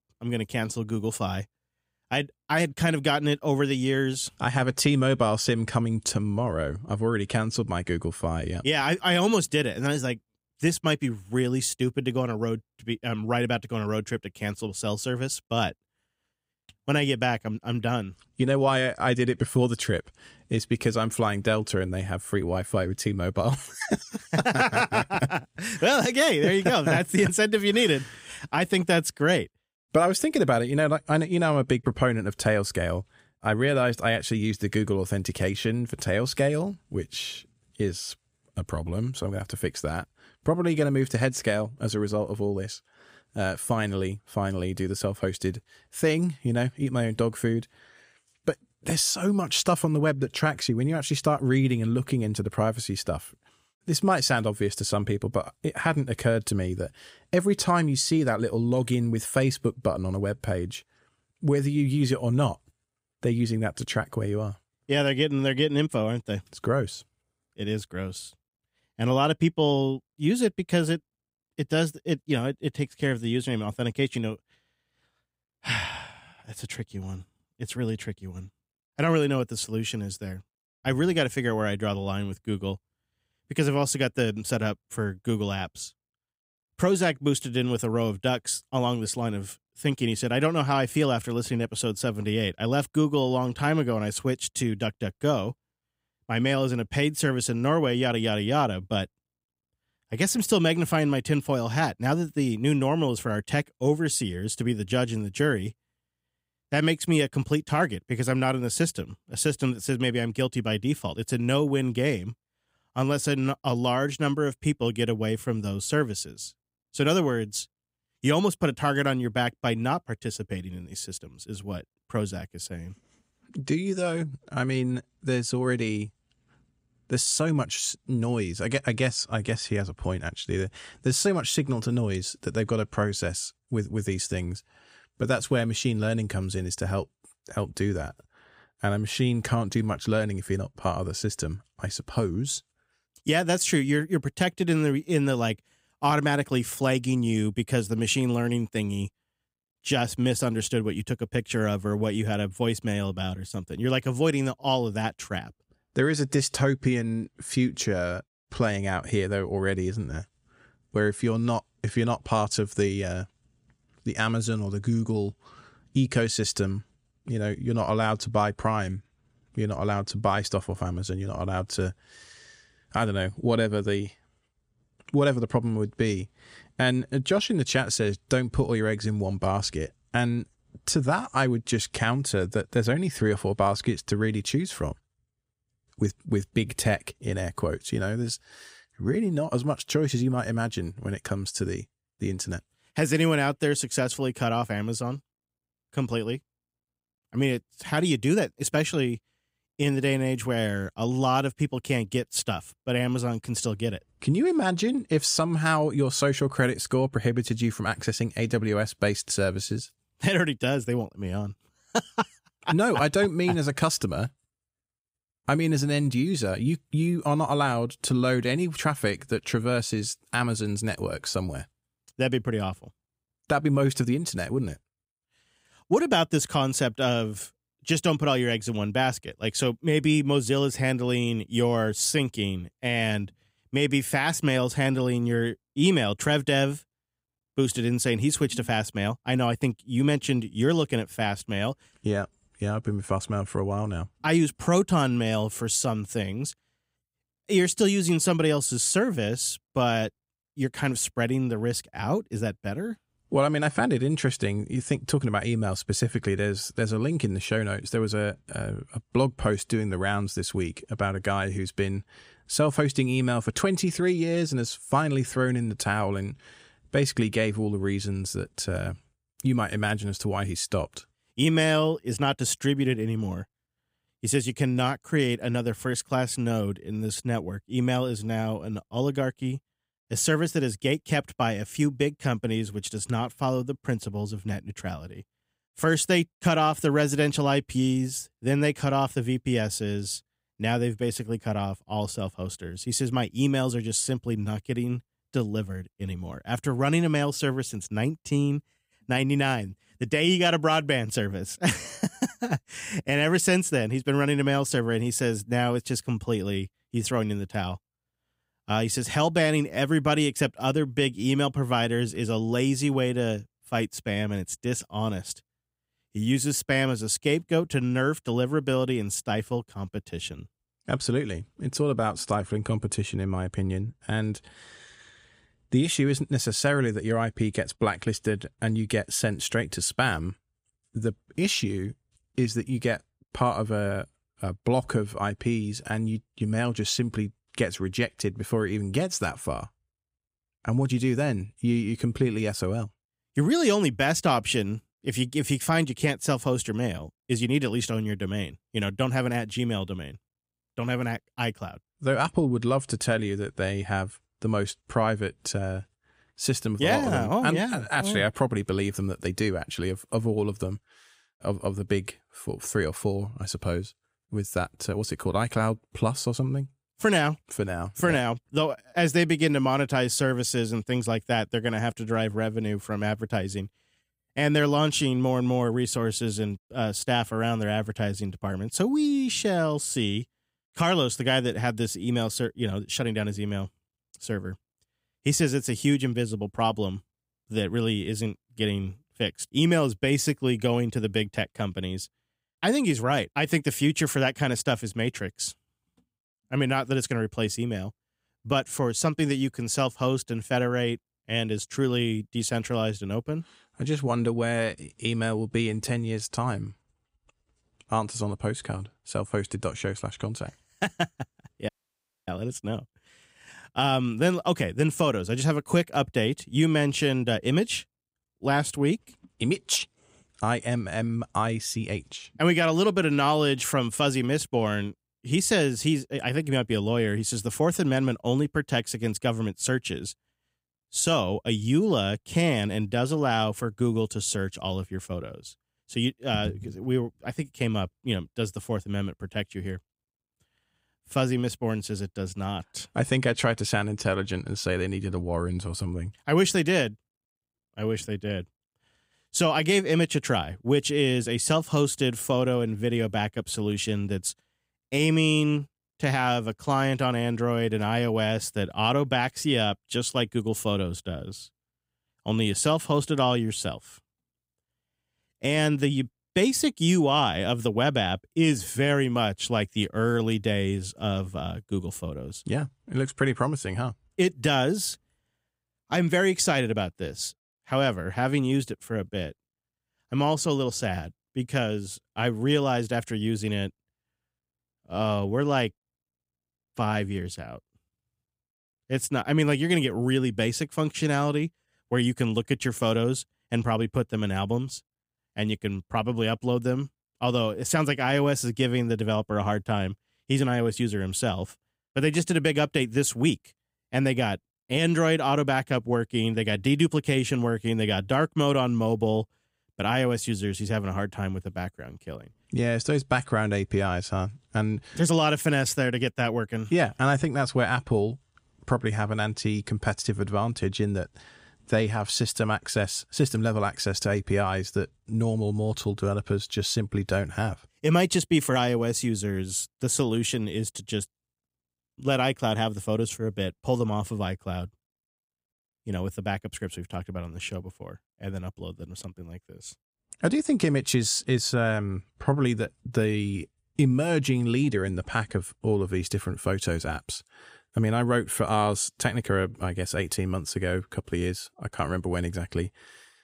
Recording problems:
audio cutting out; at 6:52 for 0.5 s

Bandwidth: 15.5 kHz